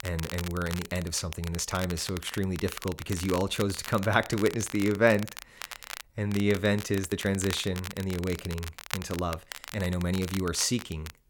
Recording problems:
crackle, like an old record; noticeable; 10 dB below the speech
uneven, jittery; strongly; from 1 to 10 s

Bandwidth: 17 kHz